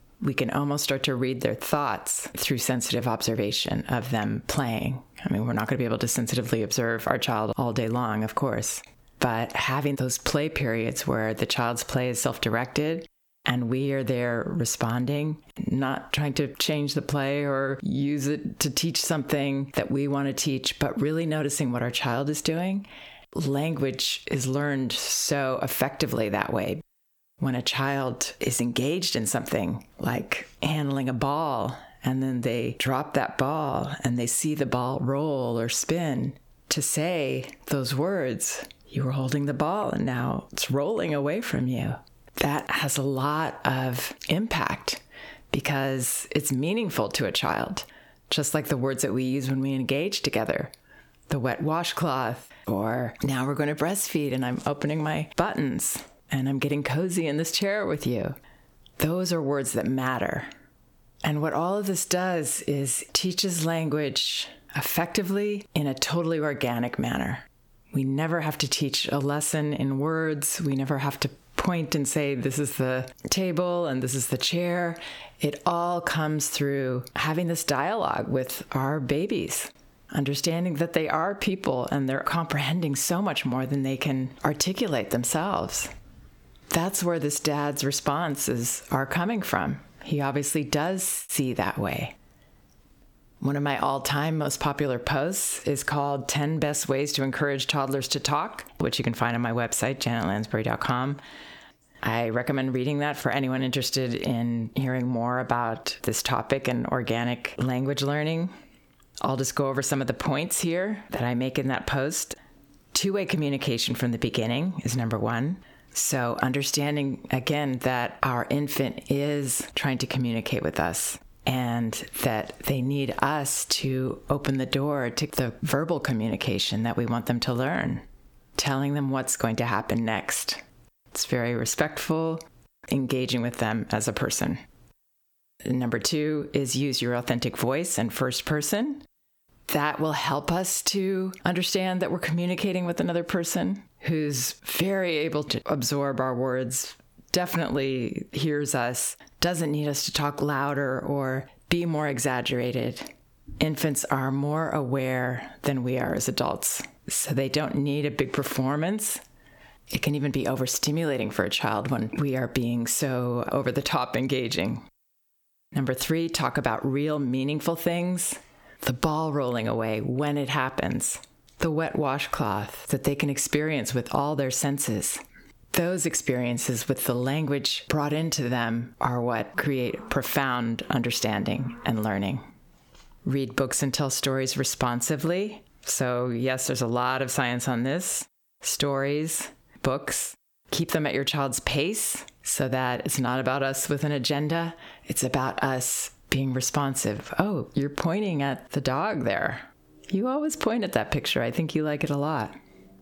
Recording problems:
squashed, flat; heavily

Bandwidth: 18.5 kHz